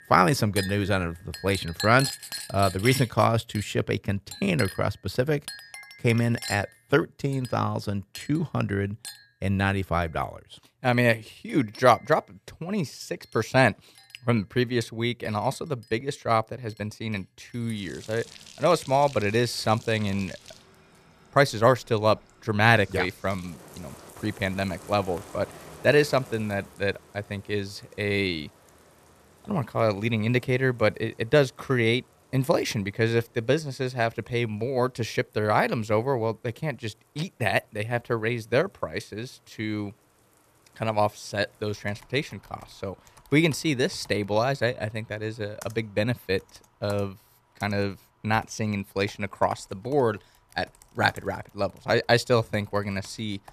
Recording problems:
household noises; noticeable; throughout; 15 dB below the speech

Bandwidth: 14.5 kHz